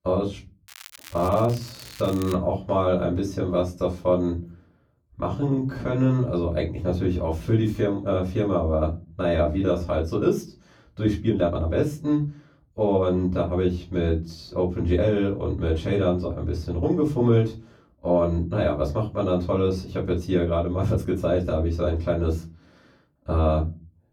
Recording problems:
off-mic speech; far
room echo; very slight; dies away in 0.3 s
crackling; noticeable; from 0.5 to 2.5 s; 20 dB below the speech
uneven, jittery; strongly; from 1 to 23 s

